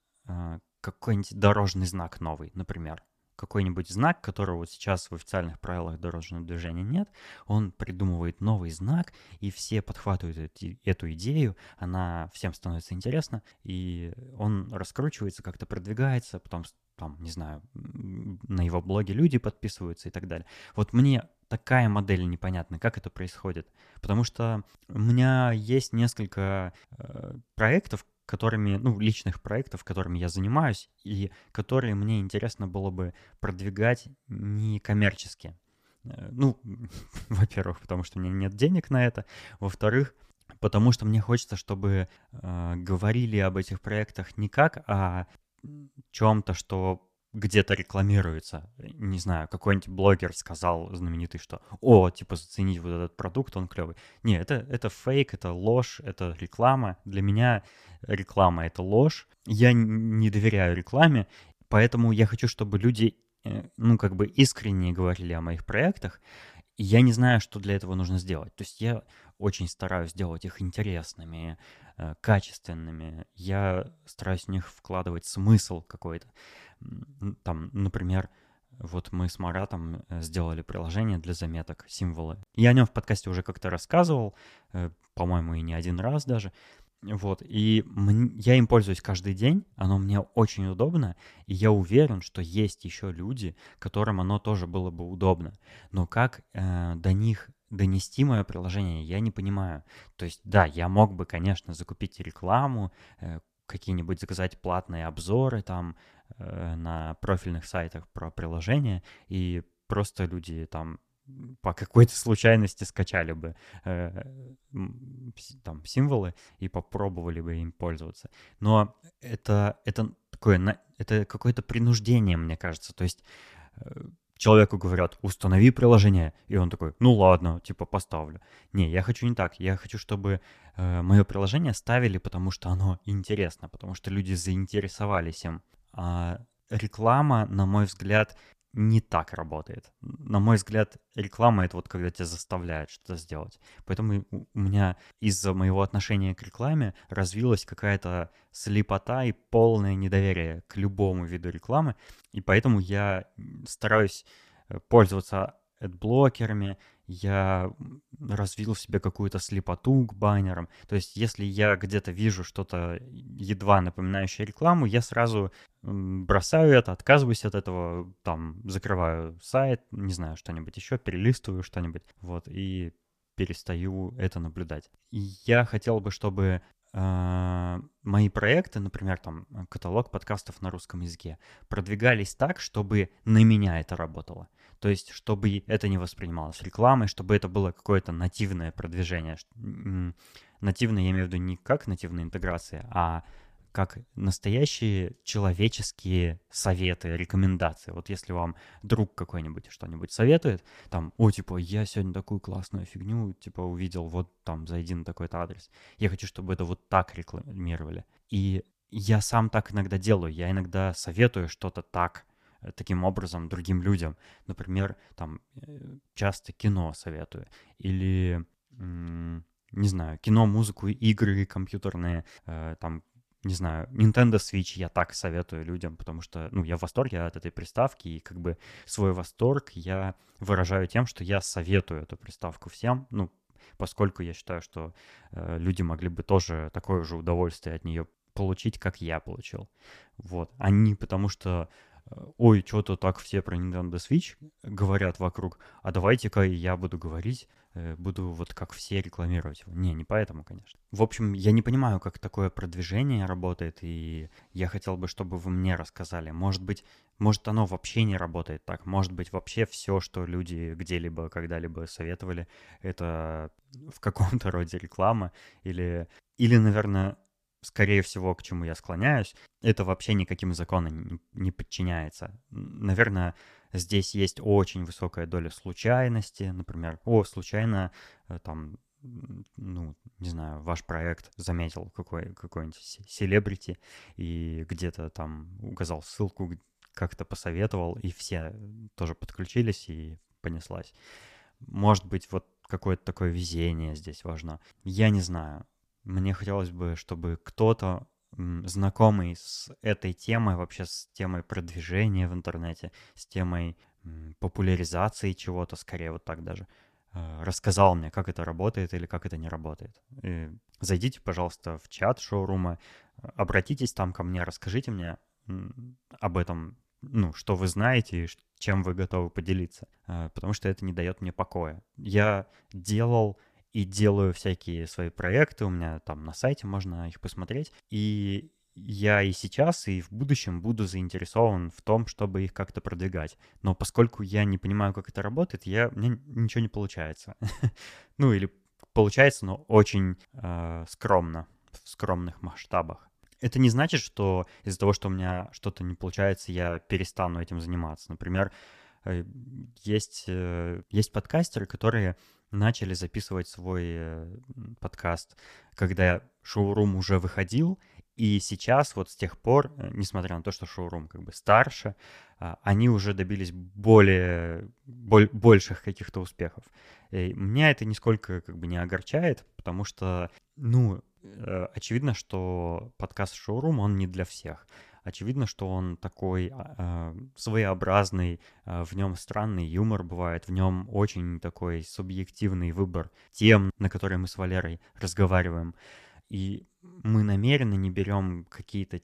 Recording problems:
uneven, jittery; strongly; from 8 s to 3:47

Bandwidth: 14.5 kHz